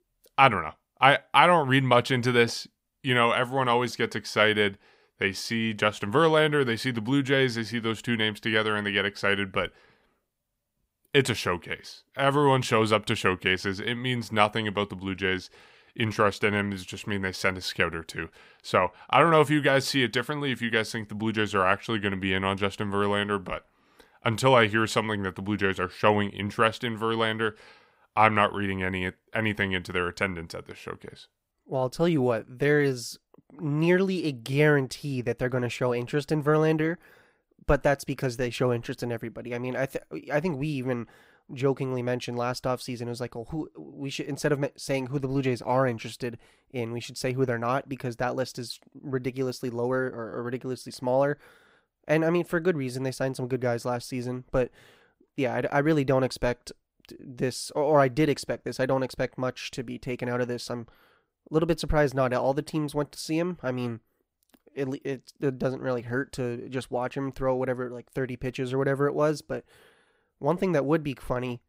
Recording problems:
none

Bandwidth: 15.5 kHz